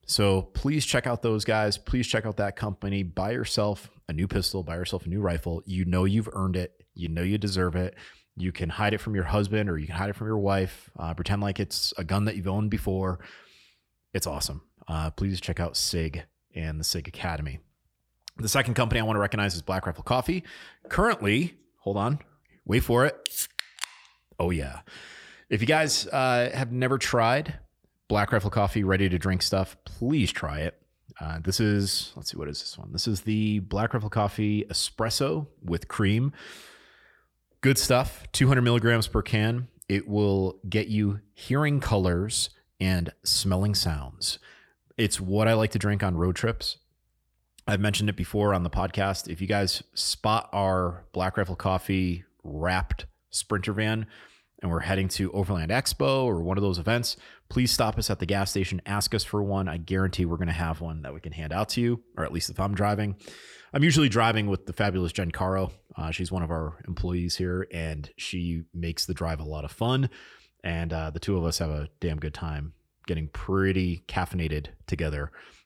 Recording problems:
none

